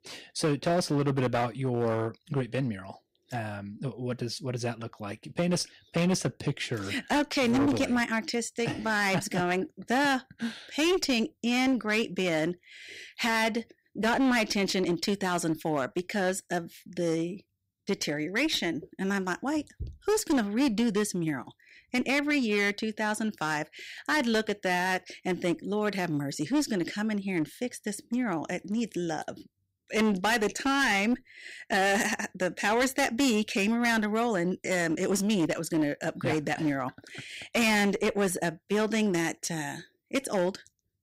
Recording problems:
distortion; slight; 11% of the sound clipped

